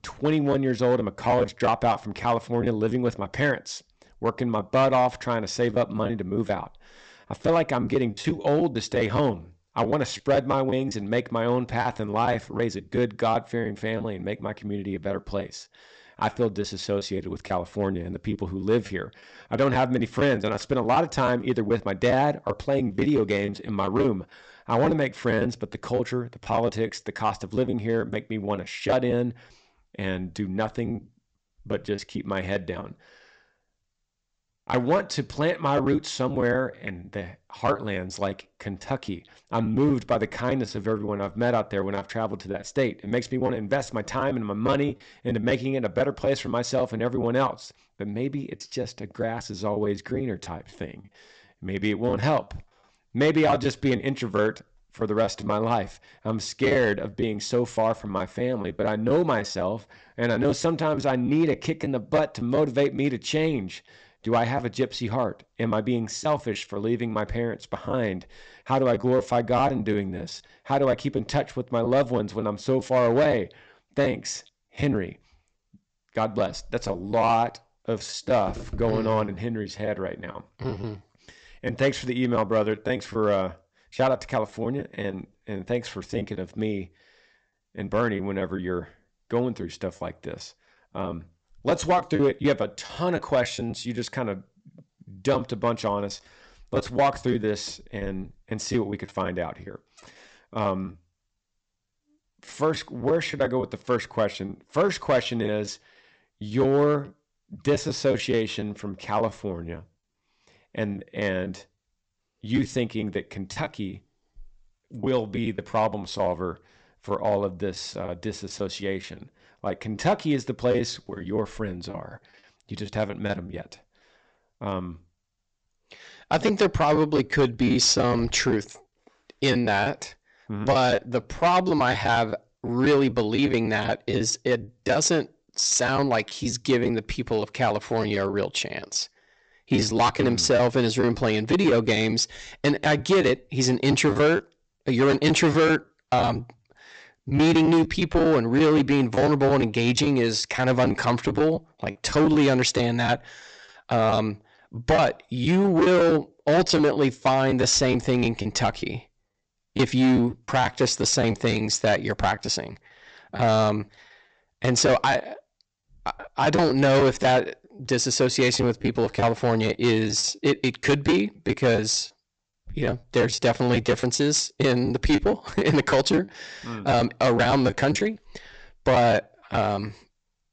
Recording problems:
high frequencies cut off; noticeable; nothing above 8 kHz
distortion; slight; 4% of the sound clipped
choppy; very; 7% of the speech affected

